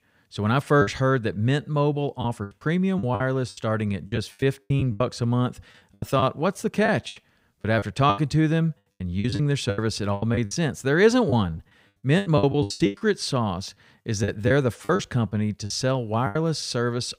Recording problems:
choppy; very; 14% of the speech affected

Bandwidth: 15.5 kHz